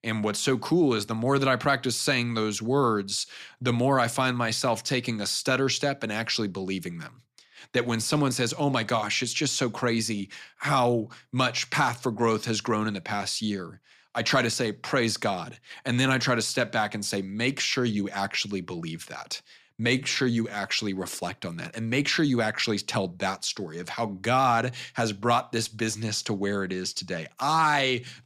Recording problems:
none

